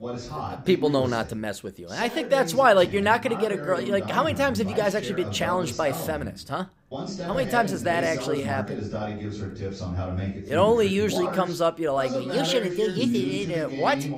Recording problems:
voice in the background; loud; throughout; 7 dB below the speech

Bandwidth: 15.5 kHz